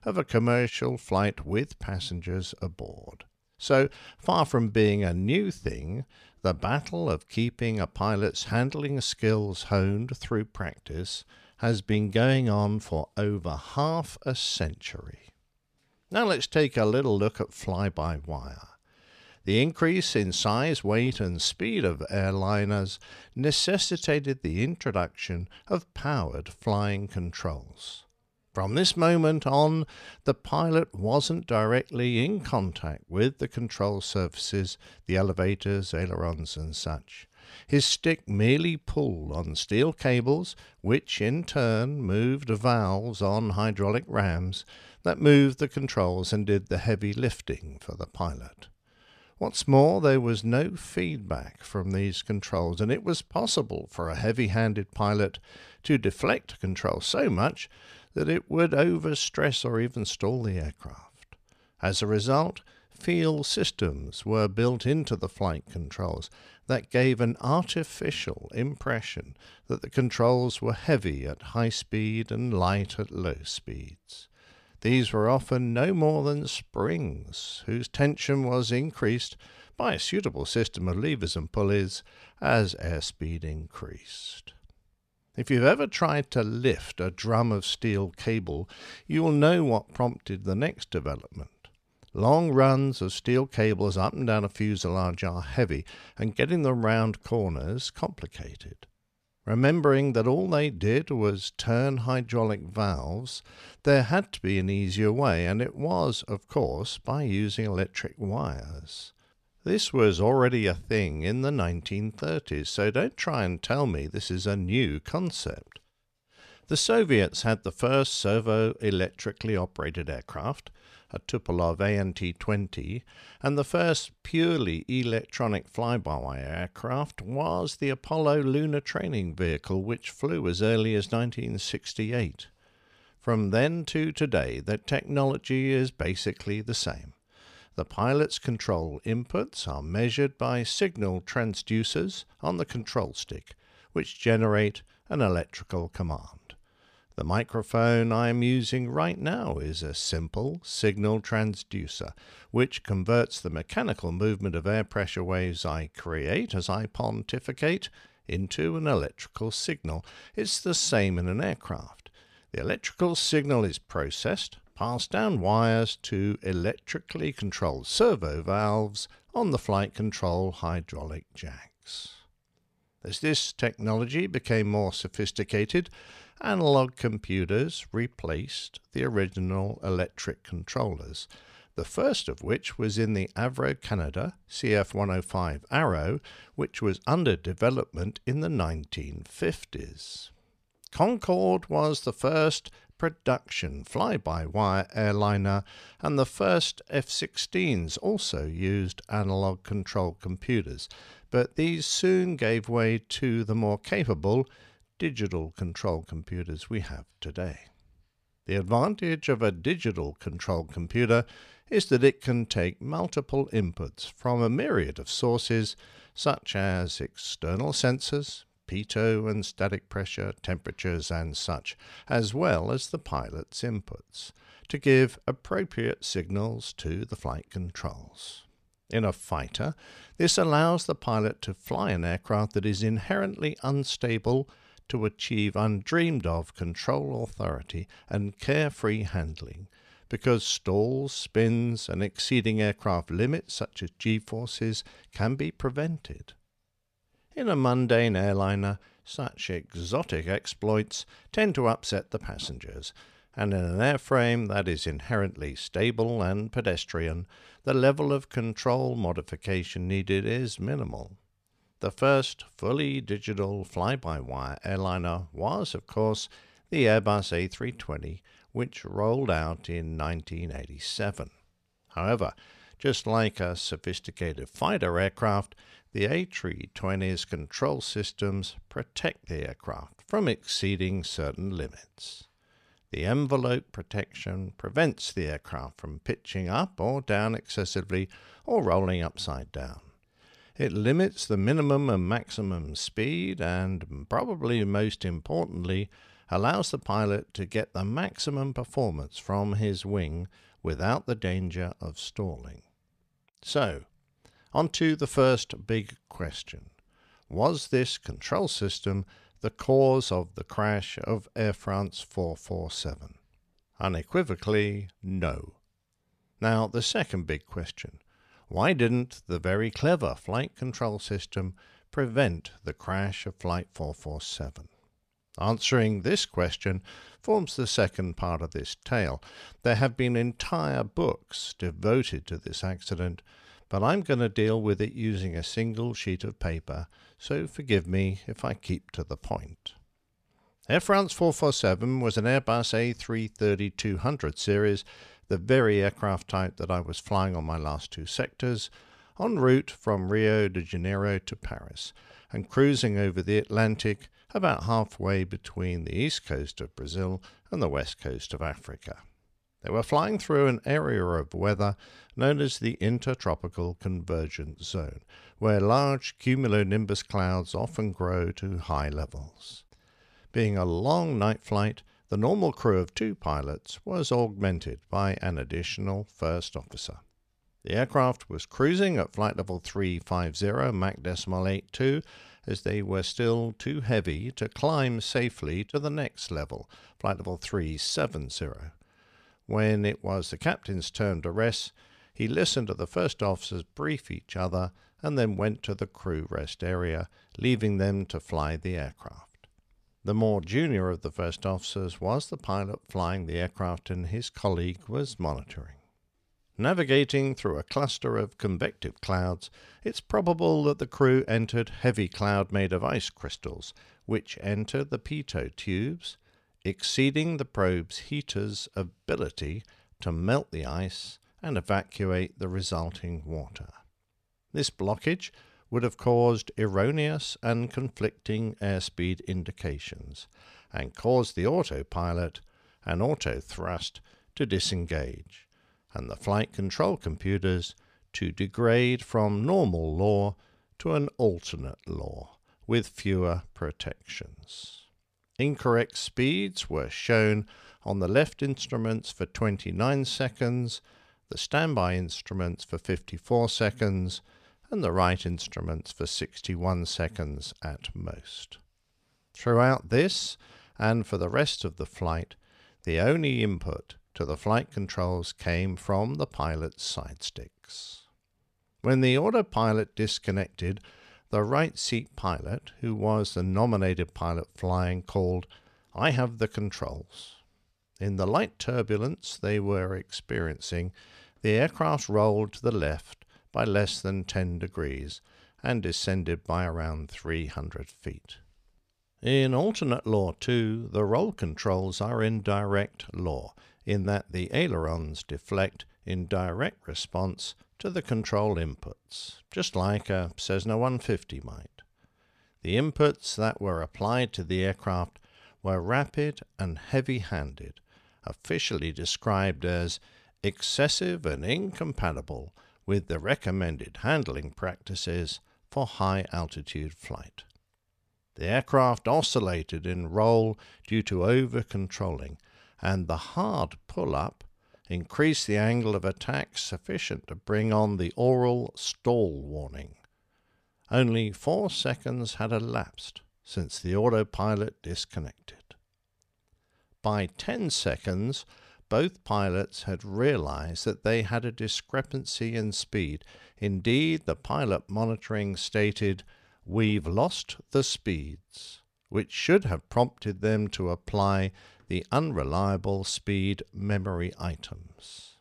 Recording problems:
none

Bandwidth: 14 kHz